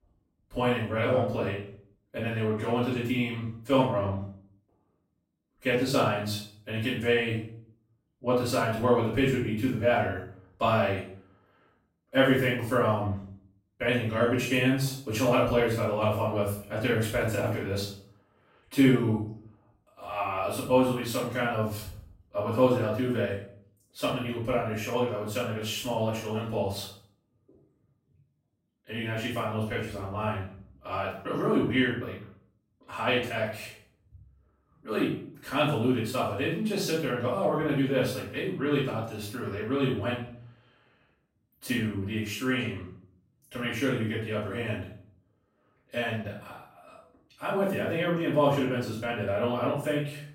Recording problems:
off-mic speech; far
room echo; noticeable; dies away in 0.5 s

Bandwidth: 16 kHz